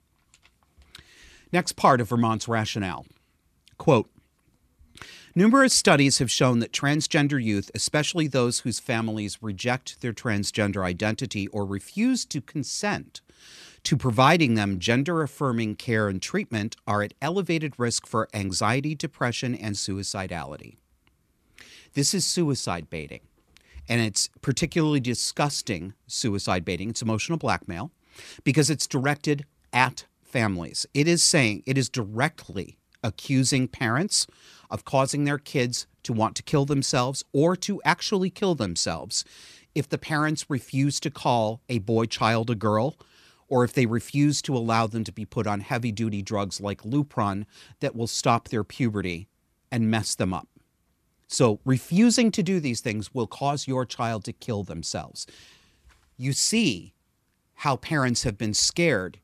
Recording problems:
none

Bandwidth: 14 kHz